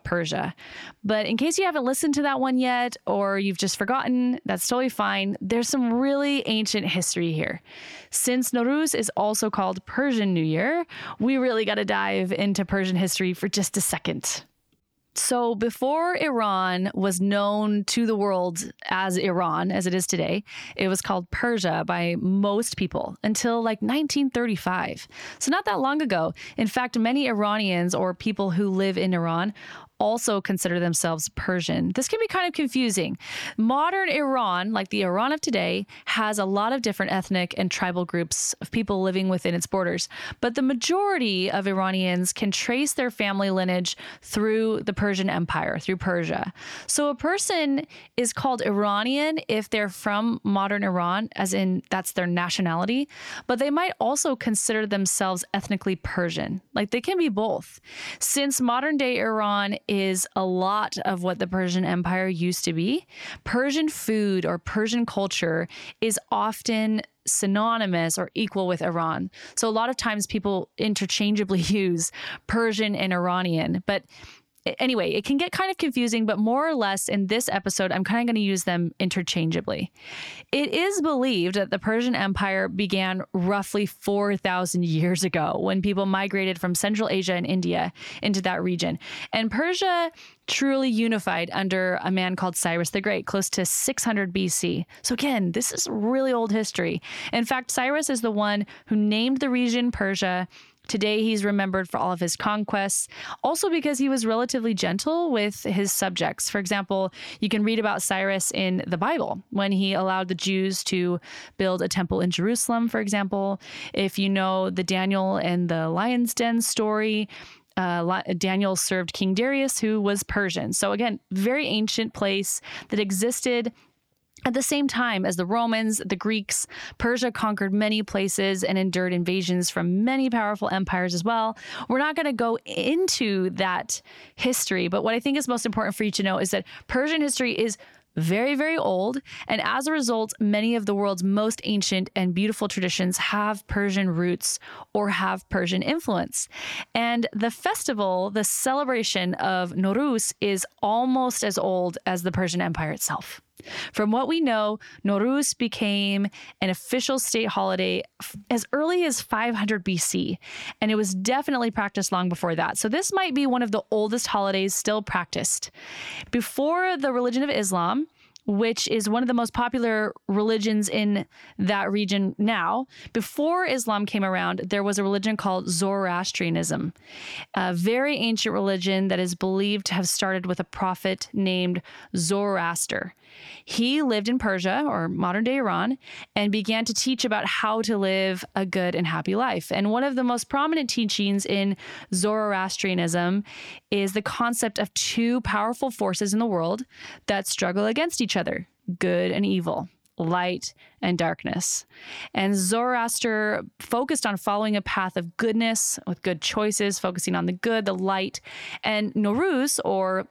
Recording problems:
squashed, flat; somewhat

